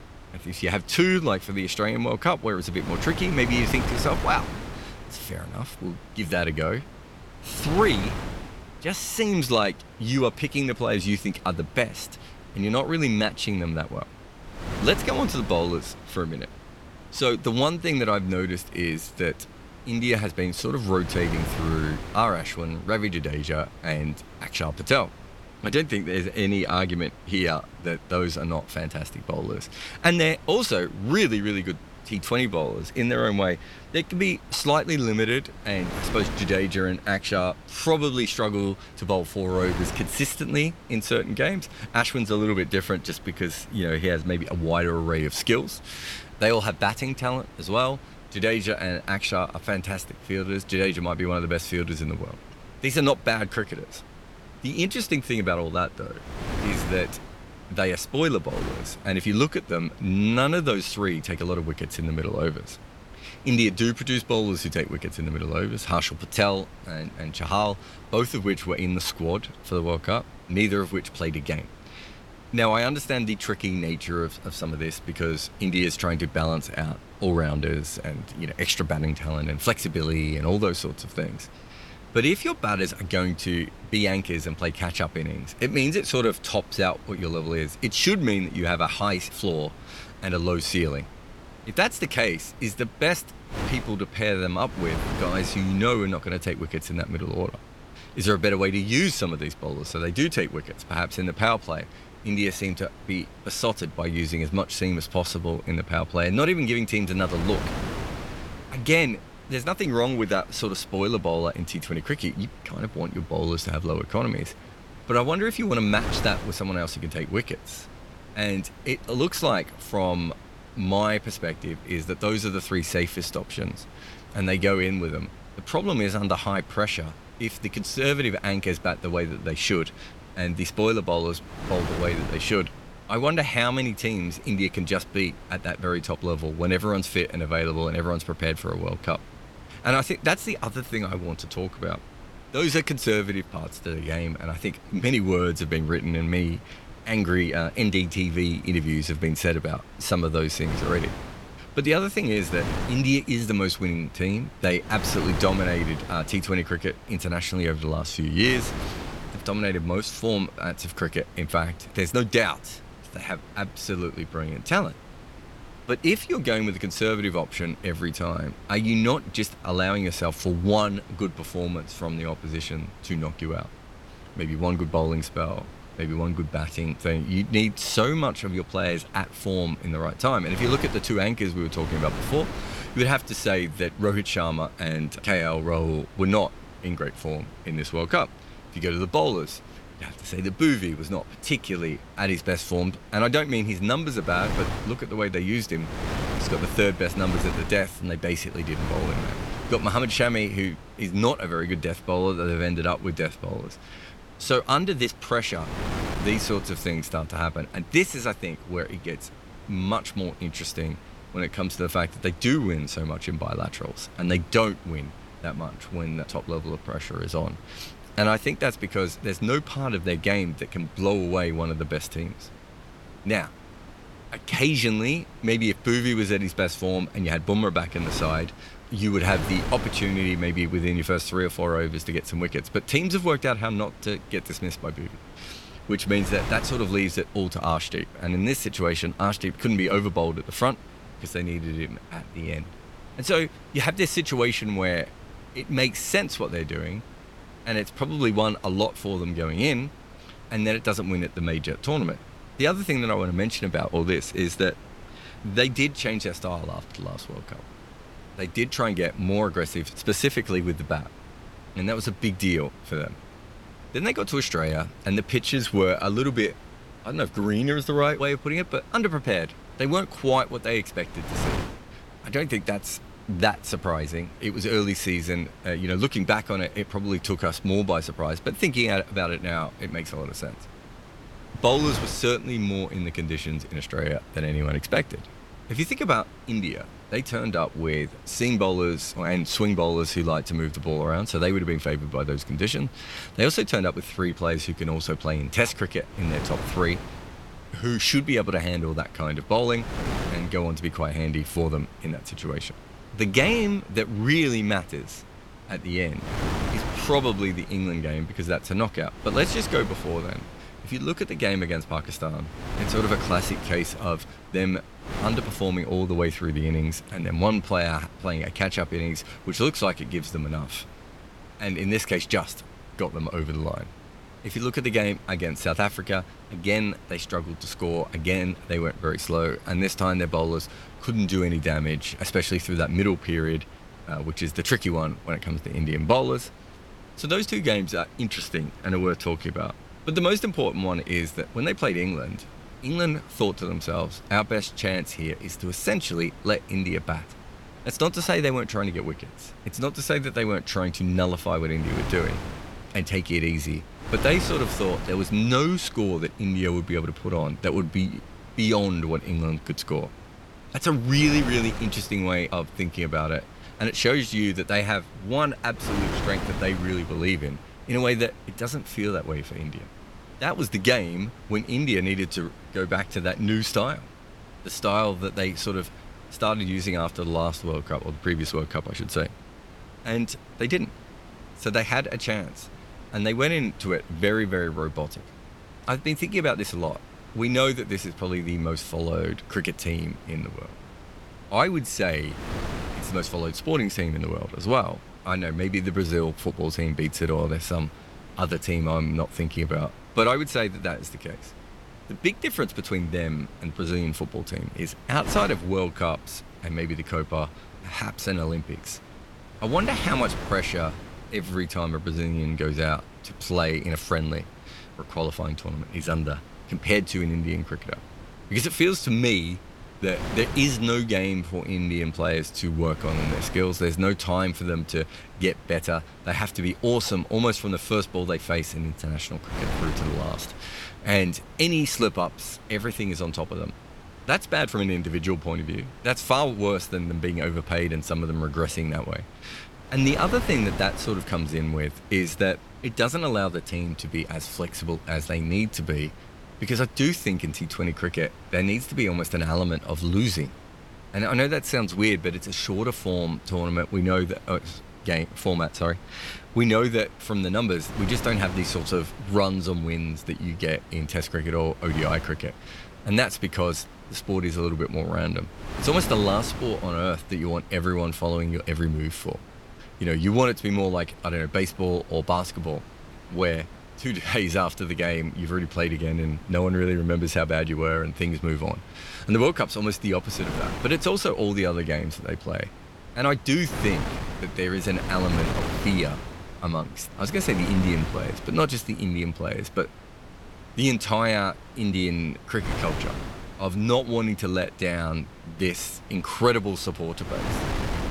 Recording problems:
wind noise on the microphone; occasional gusts; 15 dB below the speech

